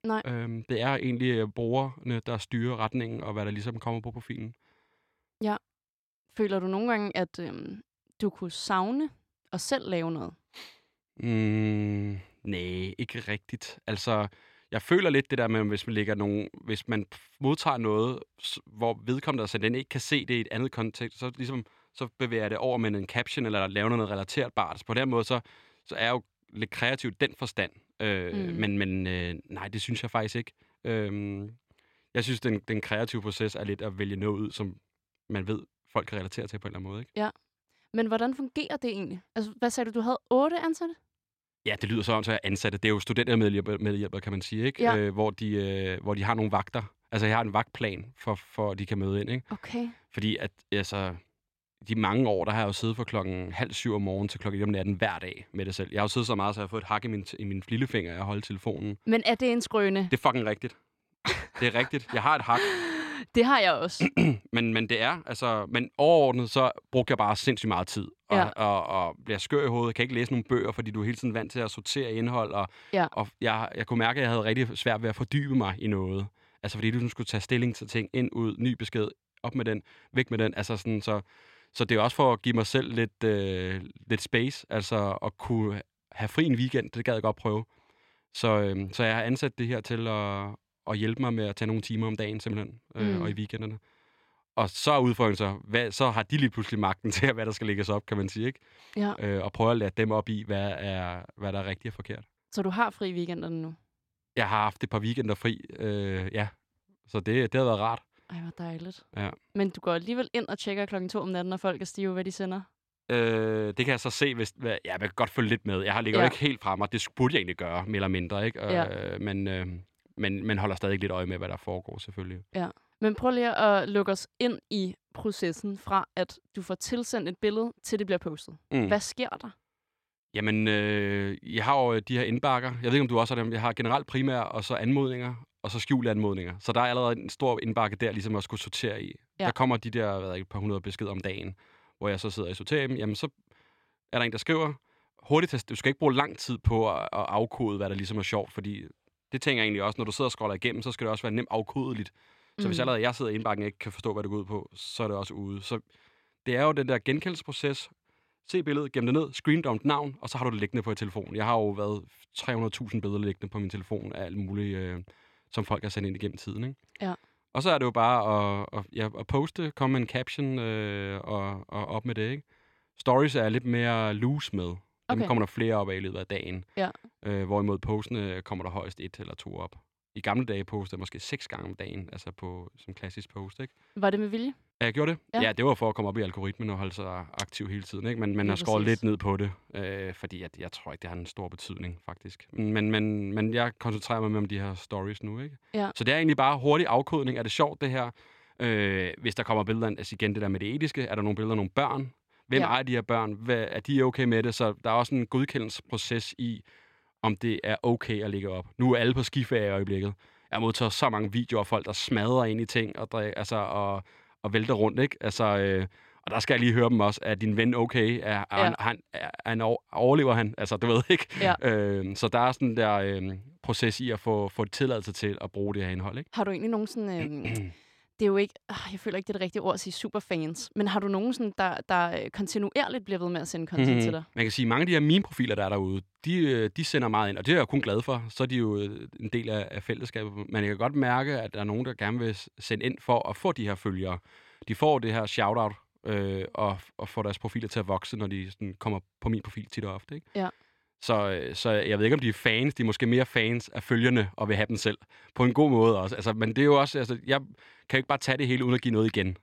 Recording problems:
none

